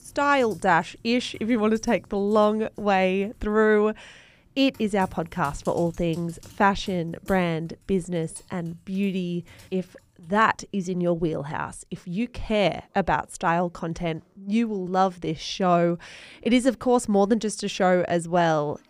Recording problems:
household noises; faint; throughout; 30 dB below the speech

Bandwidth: 15 kHz